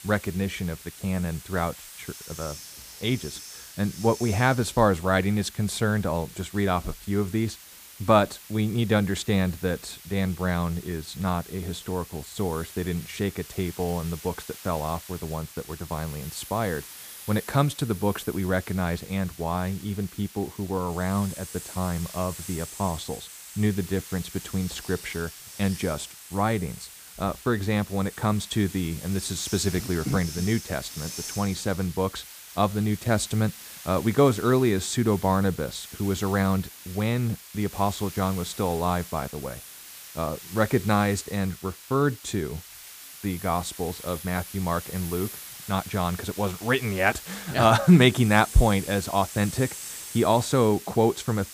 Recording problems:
hiss; noticeable; throughout; 15 dB below the speech

